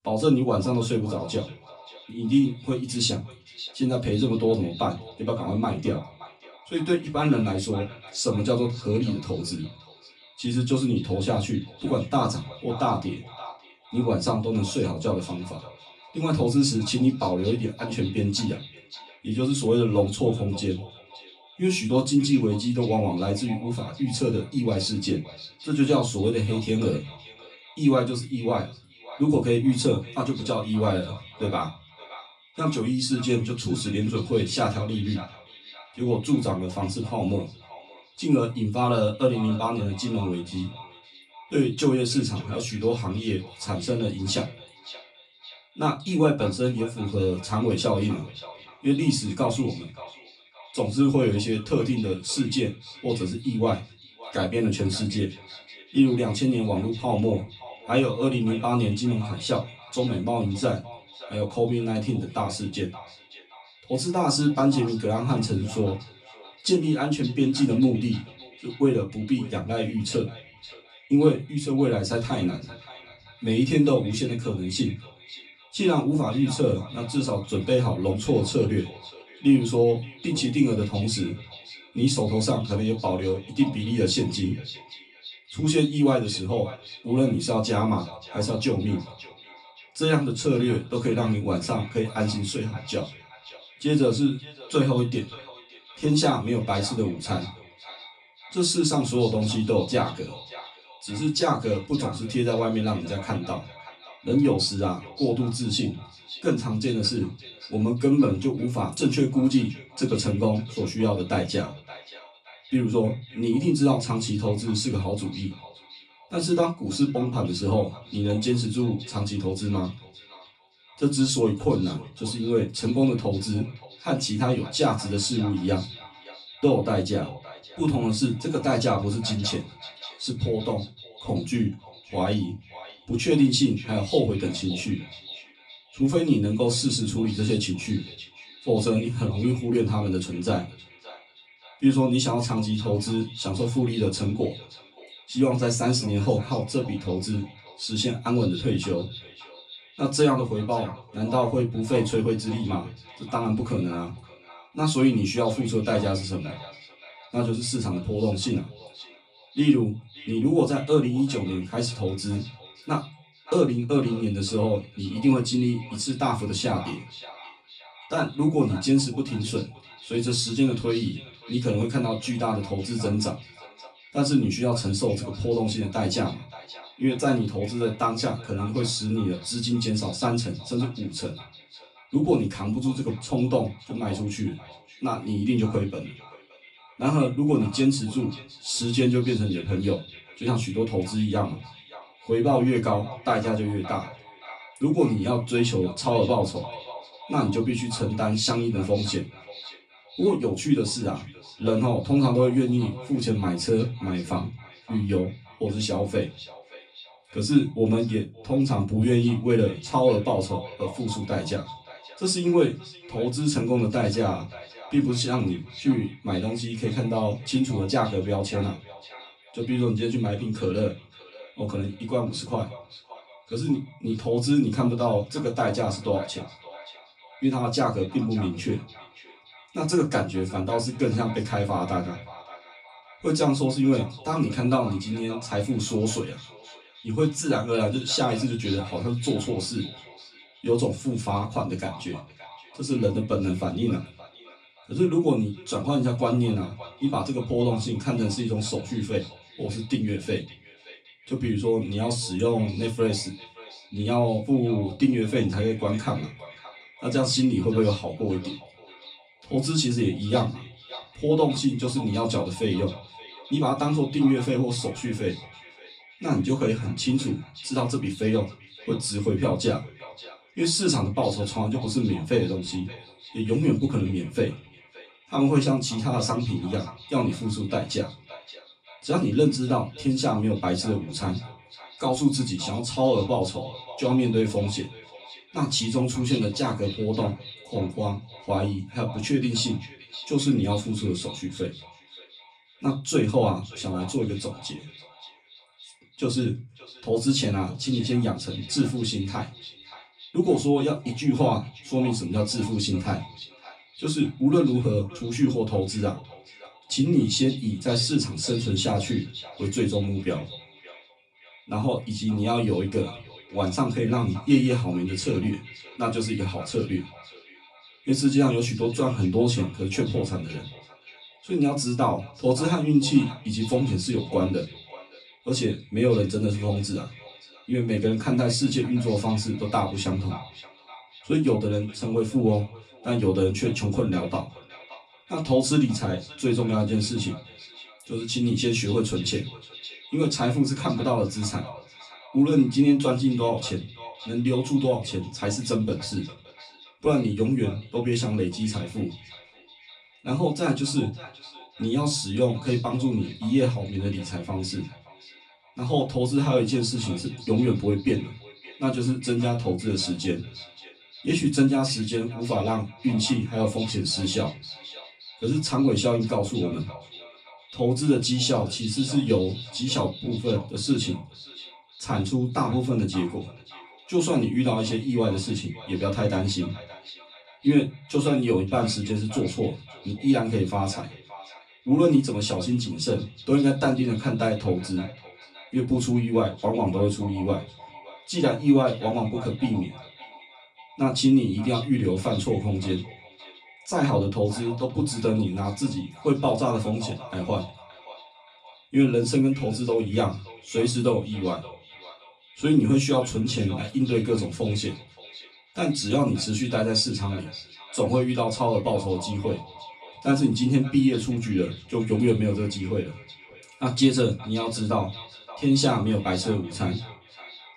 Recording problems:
off-mic speech; far
echo of what is said; faint; throughout; 570 ms later, 20 dB below the speech
room echo; very slight; dies away in 0.2 s

